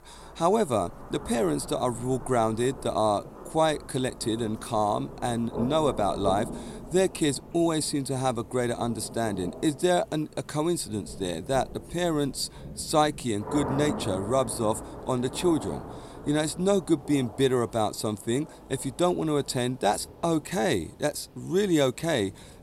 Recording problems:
rain or running water; noticeable; throughout; 15 dB below the speech

